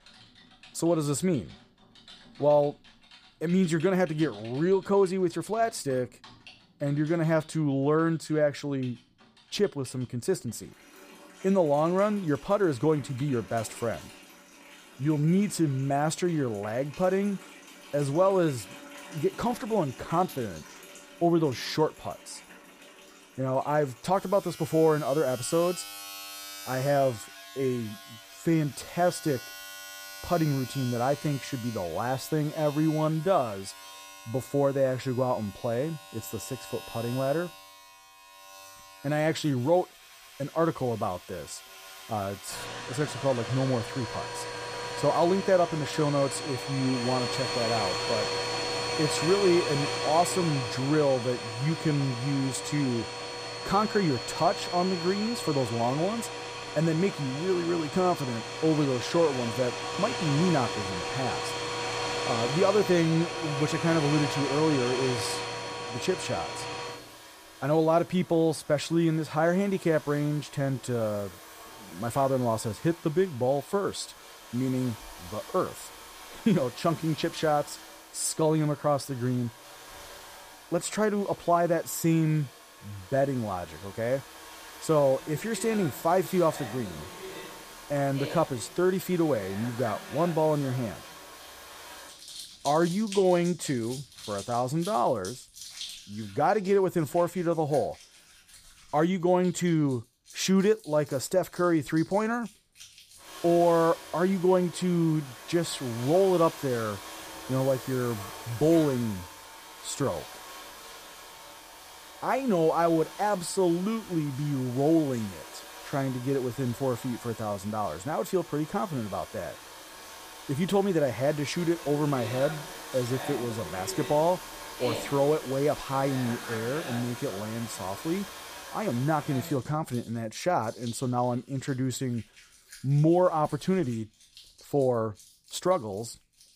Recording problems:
household noises; noticeable; throughout; 10 dB below the speech

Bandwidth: 15 kHz